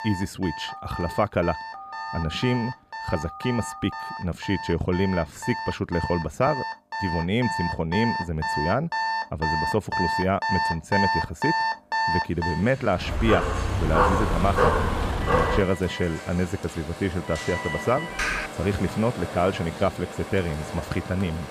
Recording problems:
alarms or sirens; loud; throughout; 4 dB below the speech
phone ringing; faint; from 0.5 to 4 s; peak 10 dB below the speech
dog barking; loud; from 13 to 16 s; peak 6 dB above the speech
keyboard typing; loud; at 18 s; peak level with the speech

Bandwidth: 14.5 kHz